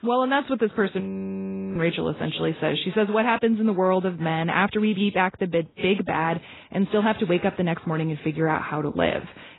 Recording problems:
garbled, watery; badly; nothing above 4 kHz
audio freezing; at 1 s for 1 s

